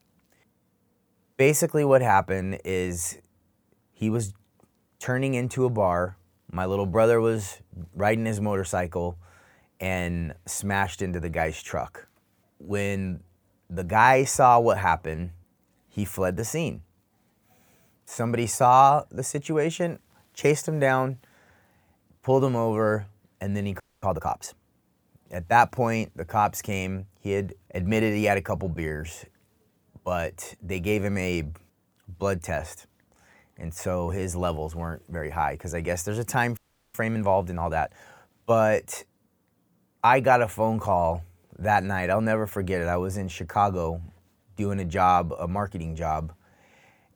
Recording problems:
audio freezing; at 24 s and at 37 s

